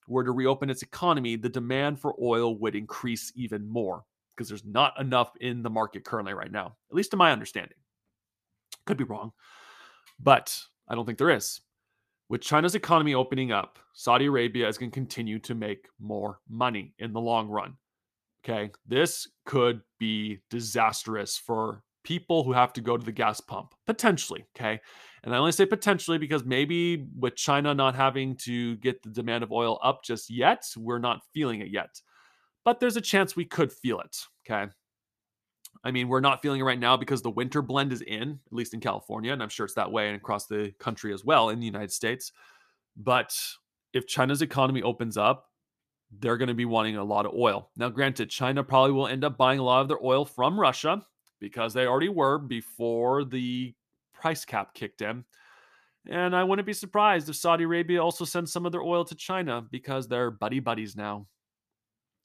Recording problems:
none

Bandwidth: 14.5 kHz